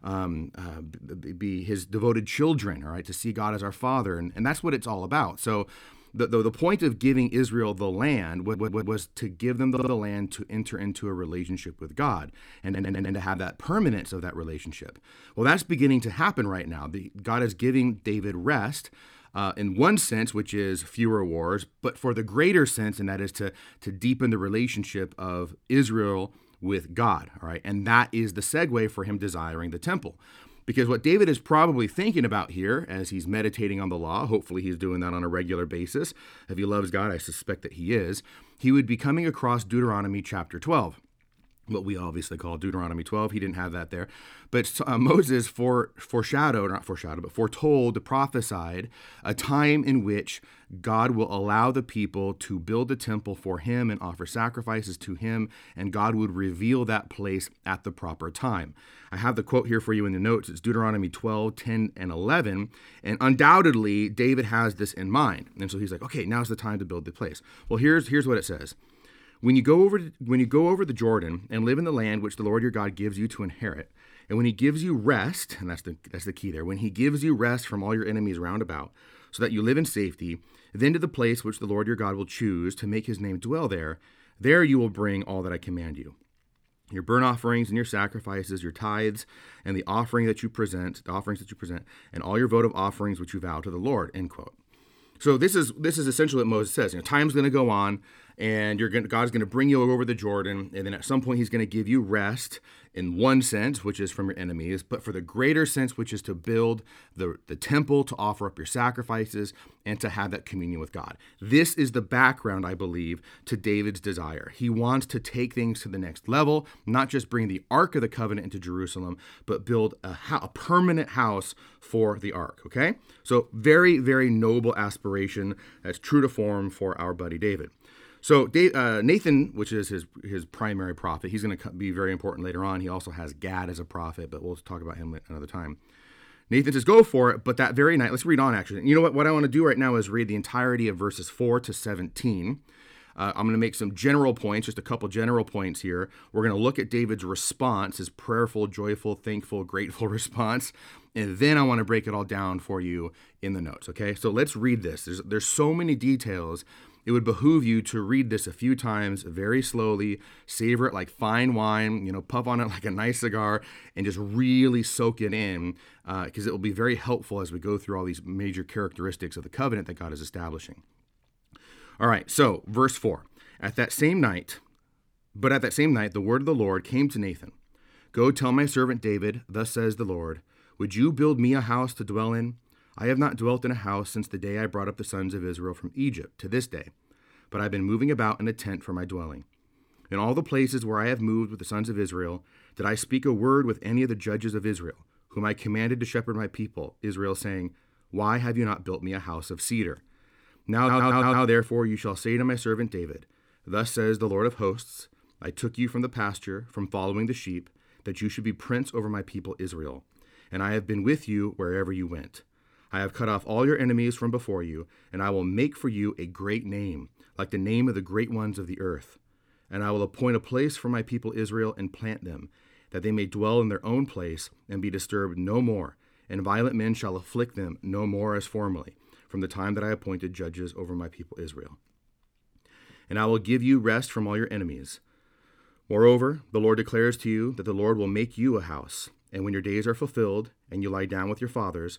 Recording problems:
audio stuttering; 4 times, first at 8.5 s

